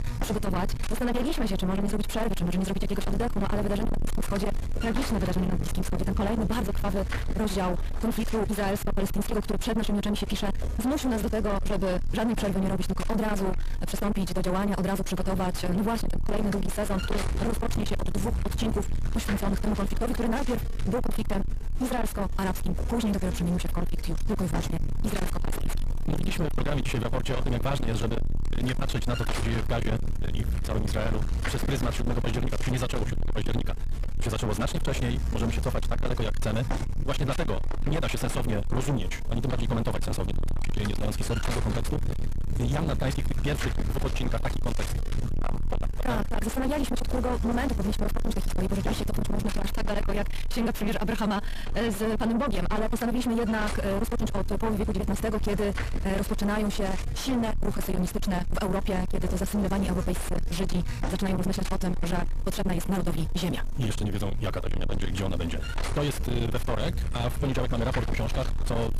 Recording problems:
distortion; heavy; 6 dB below the speech
wrong speed, natural pitch; too fast; 1.6 times normal speed
electrical hum; loud; throughout; 60 Hz, 5 dB below the speech

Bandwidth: 14.5 kHz